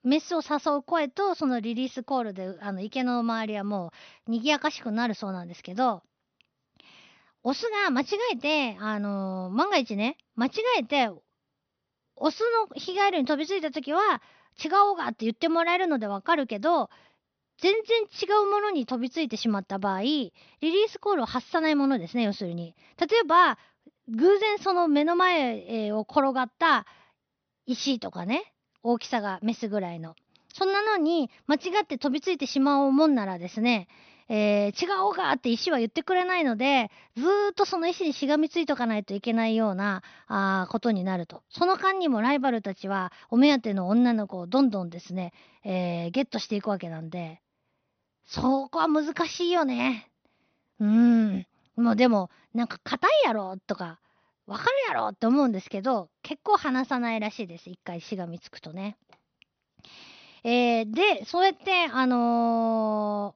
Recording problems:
high frequencies cut off; noticeable; nothing above 6 kHz

